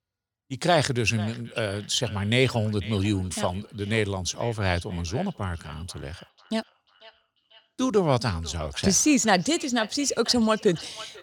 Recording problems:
echo of what is said; faint; throughout; 490 ms later, 20 dB below the speech

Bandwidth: 18 kHz